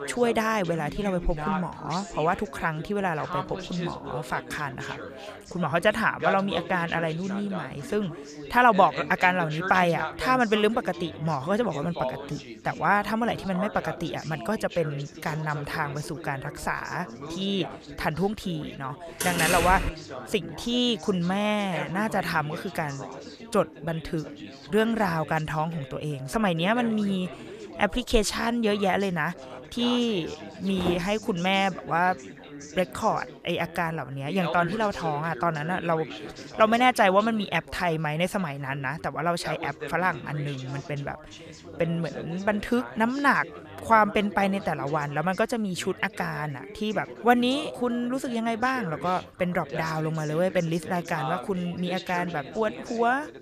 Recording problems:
background chatter; noticeable; throughout; 4 voices, 10 dB below the speech
door banging; loud; at 19 s; peak 2 dB above the speech
footsteps; noticeable; at 31 s; peak 6 dB below the speech

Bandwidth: 14.5 kHz